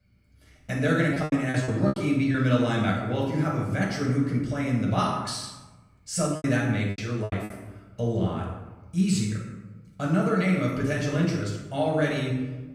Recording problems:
off-mic speech; far
room echo; noticeable; dies away in 0.9 s
choppy; very; from 1 to 2.5 s and at 6.5 s; 16% of the speech affected

